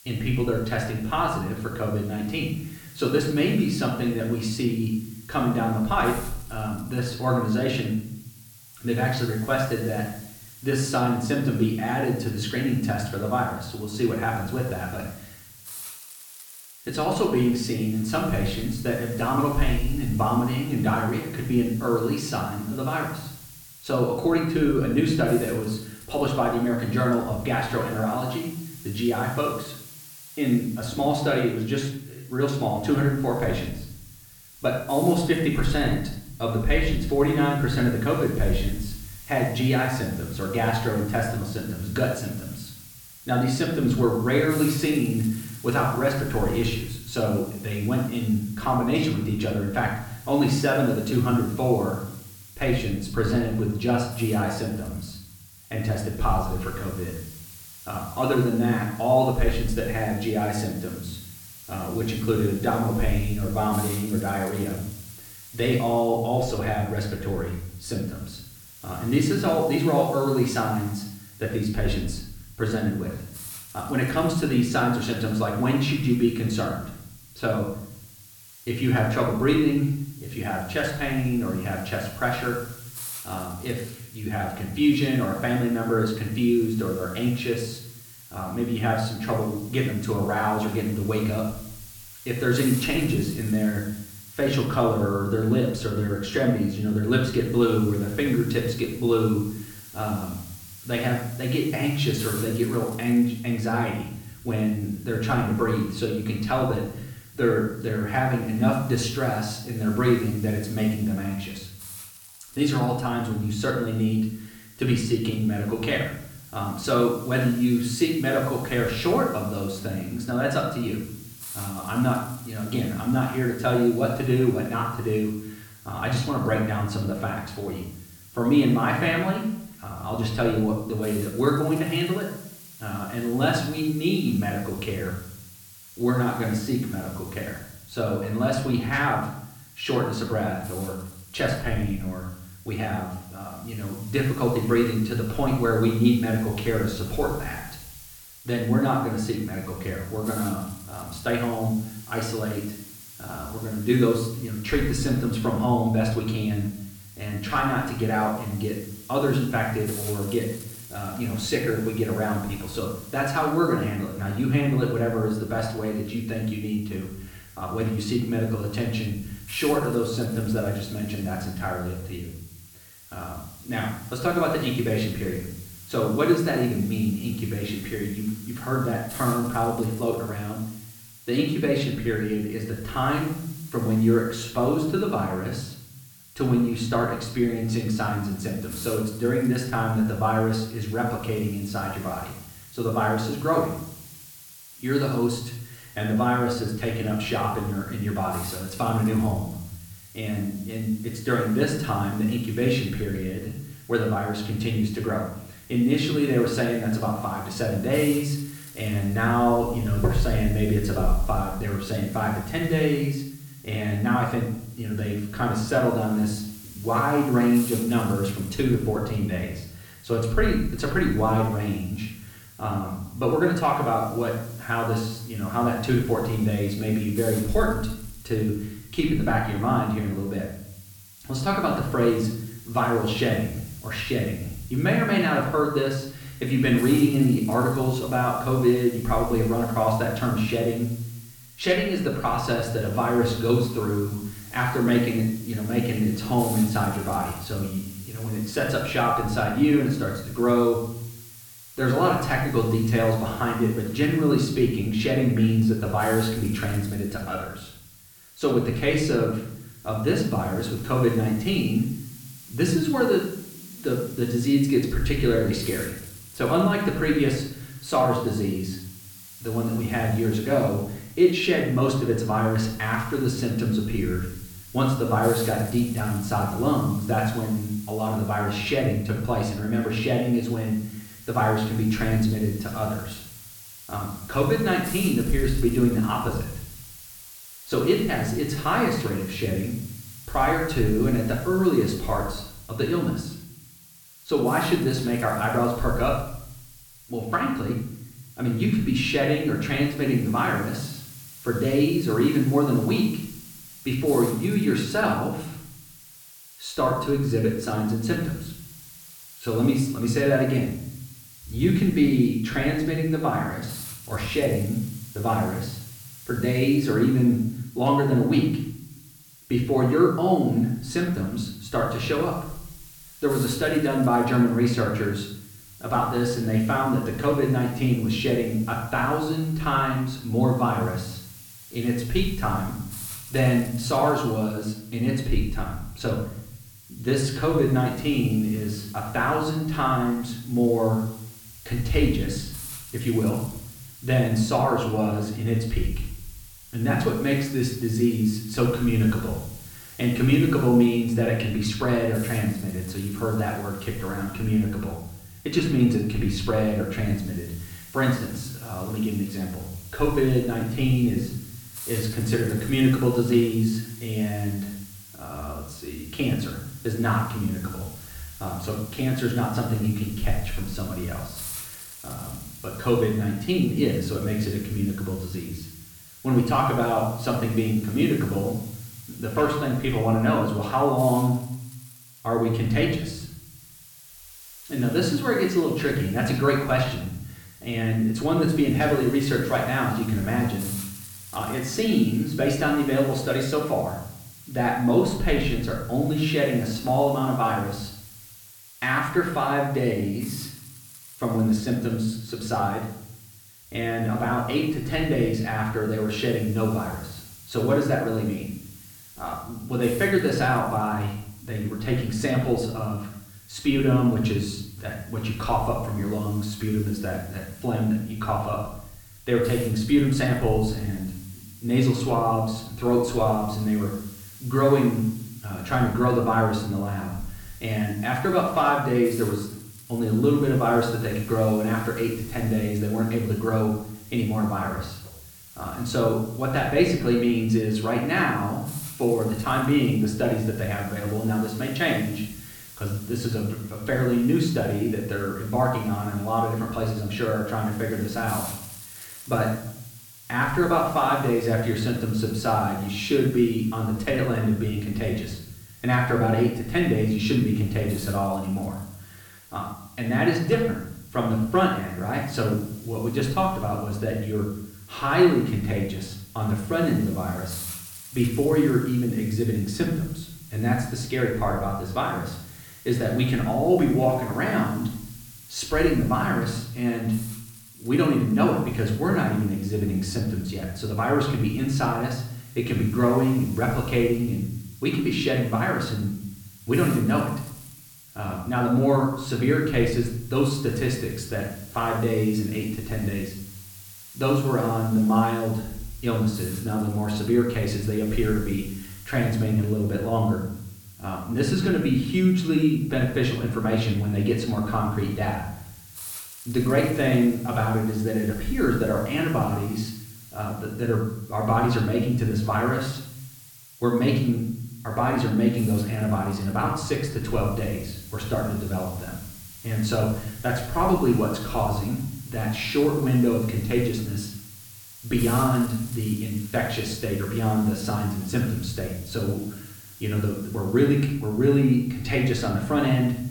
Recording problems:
off-mic speech; far
room echo; noticeable; dies away in 0.8 s
hiss; noticeable; throughout; 20 dB below the speech

